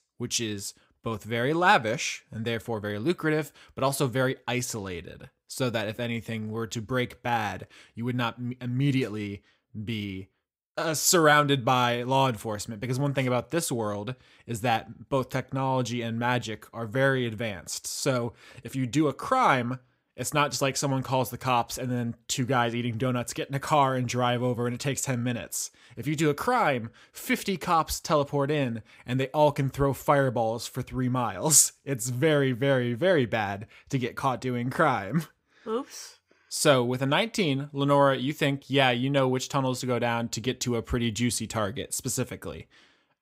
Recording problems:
none

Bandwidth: 15.5 kHz